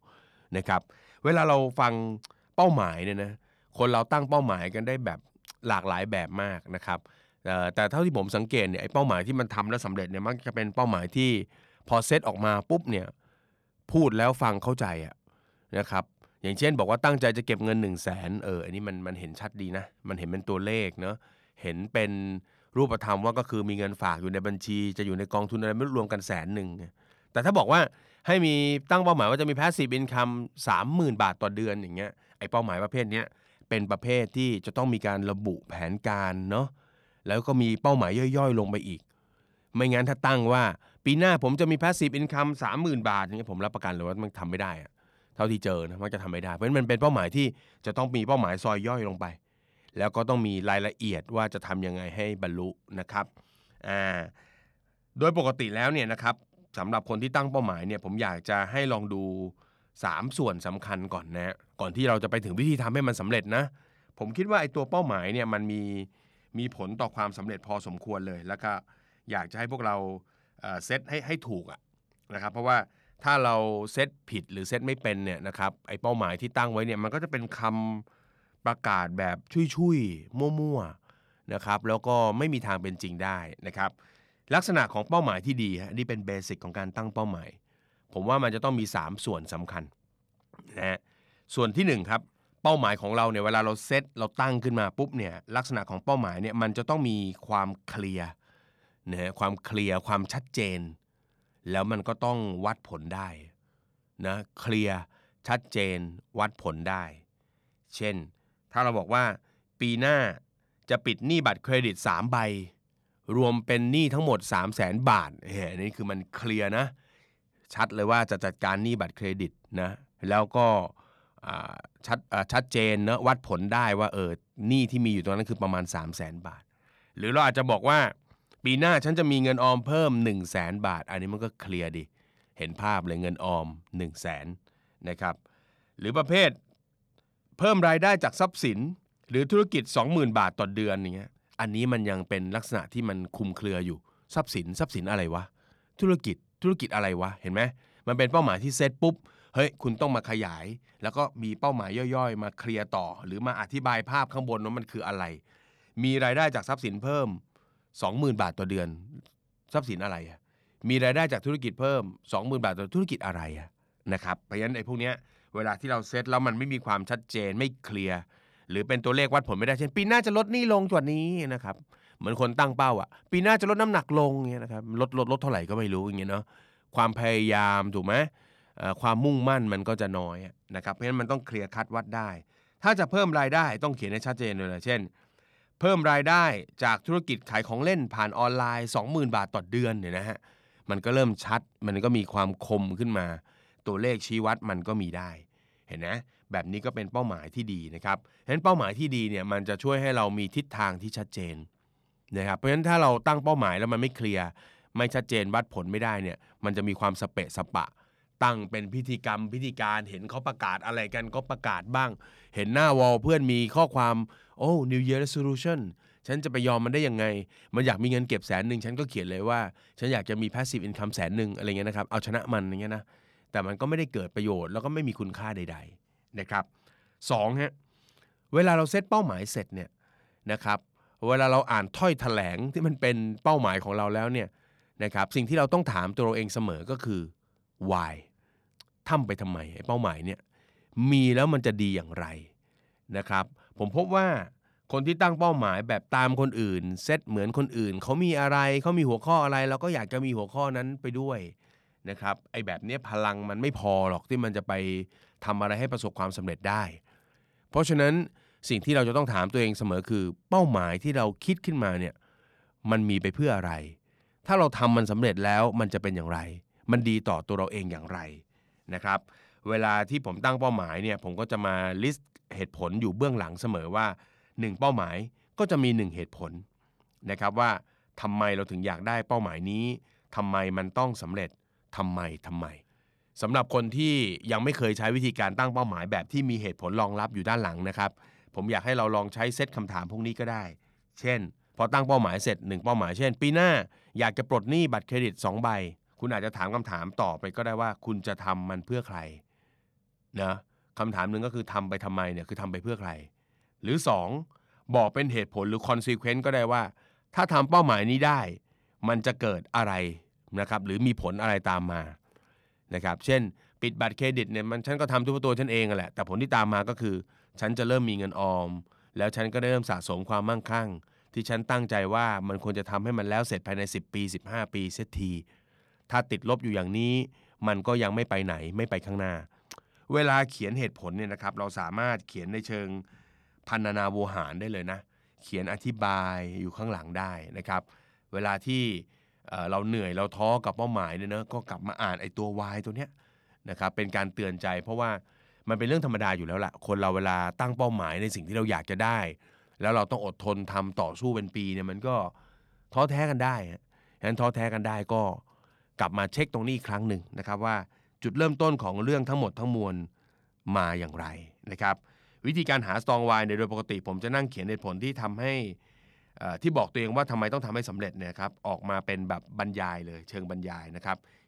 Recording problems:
none

